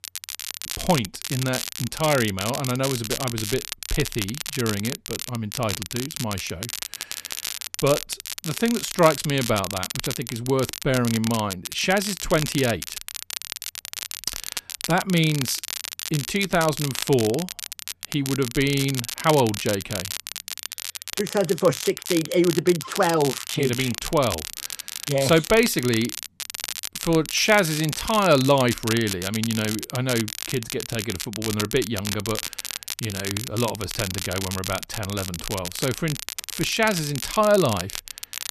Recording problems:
crackle, like an old record; loud; 7 dB below the speech

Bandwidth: 13.5 kHz